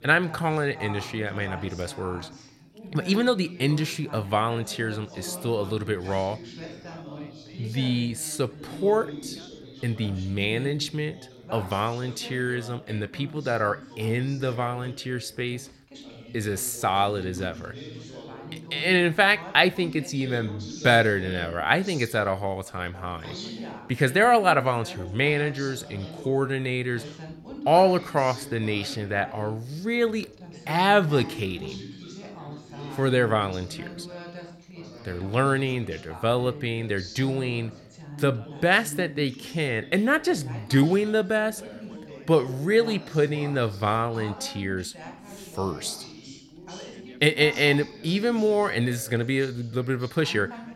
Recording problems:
background chatter; noticeable; throughout; 3 voices, 15 dB below the speech

